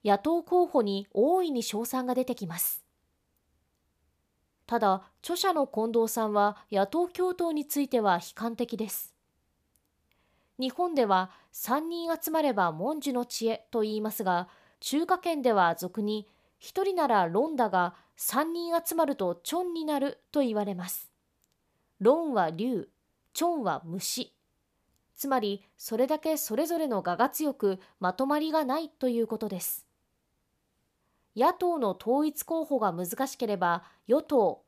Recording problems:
none

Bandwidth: 14.5 kHz